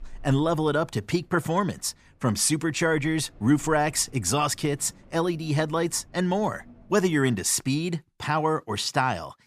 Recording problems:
wind in the background; faint; until 7.5 s; 30 dB below the speech

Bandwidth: 14.5 kHz